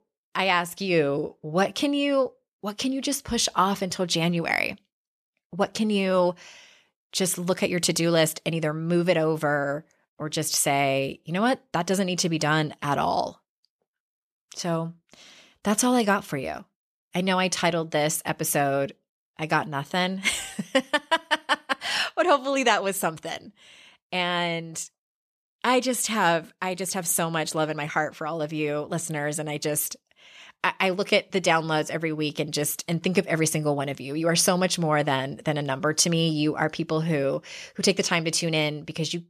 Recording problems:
none

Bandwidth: 14 kHz